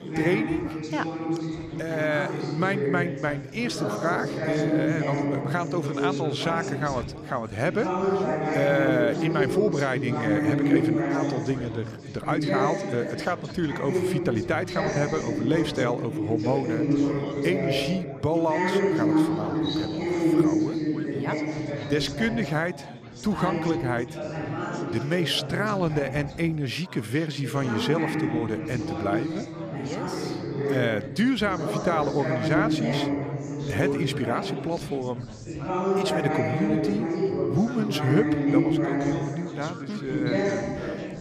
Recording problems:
chatter from many people; very loud; throughout; 1 dB above the speech

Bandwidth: 14.5 kHz